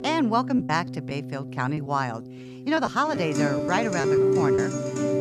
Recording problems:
background music; very loud; throughout; as loud as the speech
choppy; very; 7% of the speech affected

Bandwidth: 15 kHz